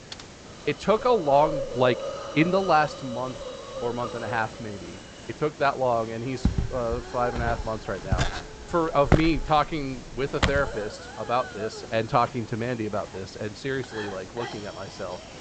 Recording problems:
high frequencies cut off; noticeable; nothing above 8 kHz
hiss; noticeable; throughout; 10 dB below the speech
keyboard typing; faint; at the start; peak 15 dB below the speech
footsteps; loud; from 6.5 to 11 s; peak 3 dB above the speech

